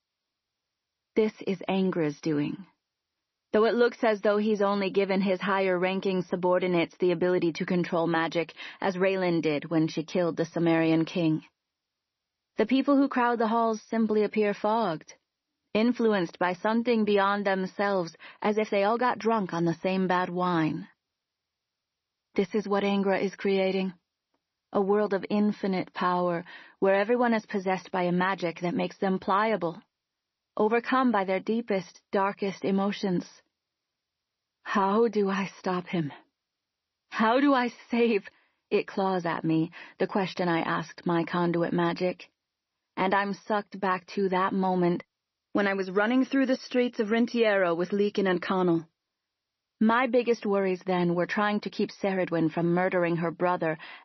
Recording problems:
garbled, watery; slightly; nothing above 6 kHz

